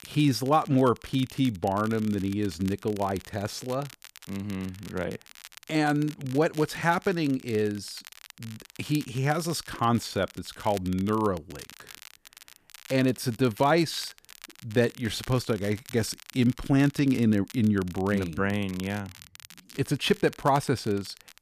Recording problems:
crackle, like an old record; noticeable; 20 dB below the speech

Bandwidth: 14.5 kHz